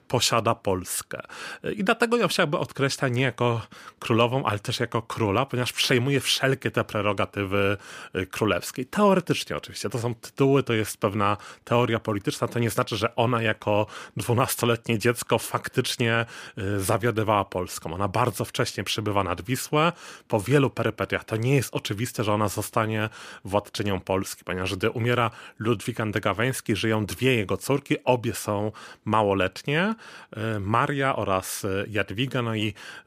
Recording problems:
none

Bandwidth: 15 kHz